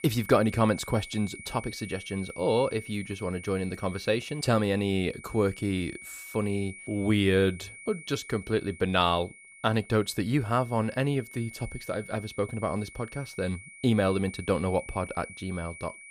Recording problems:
high-pitched whine; noticeable; throughout; 2.5 kHz, 15 dB below the speech

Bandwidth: 15 kHz